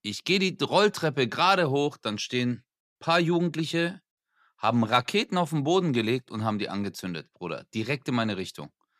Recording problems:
none

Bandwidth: 14.5 kHz